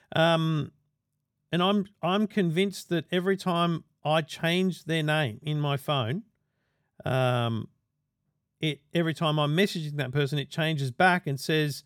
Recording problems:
none

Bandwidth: 18 kHz